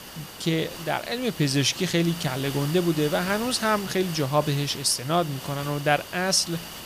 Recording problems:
hiss; noticeable; throughout; 10 dB below the speech

